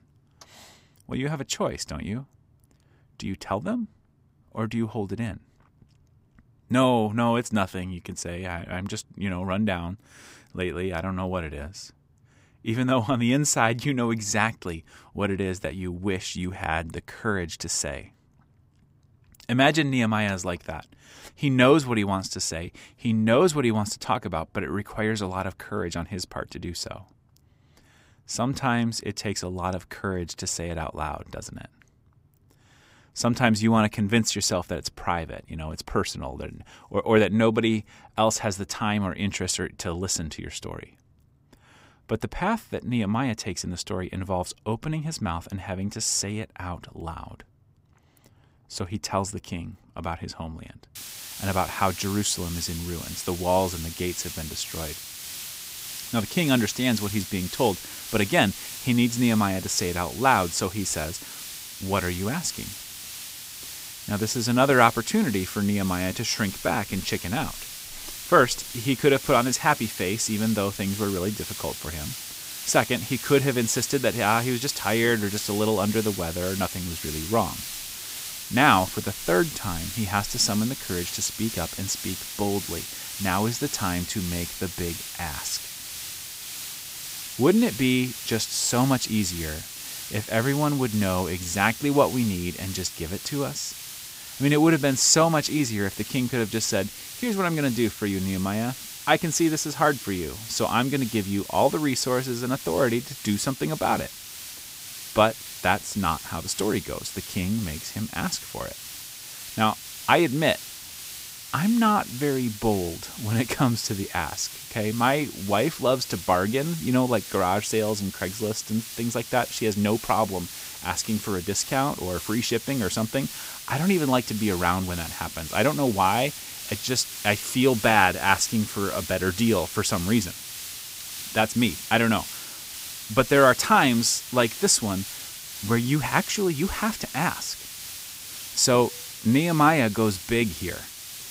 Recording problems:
hiss; loud; from 51 s on; 10 dB below the speech

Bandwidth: 15.5 kHz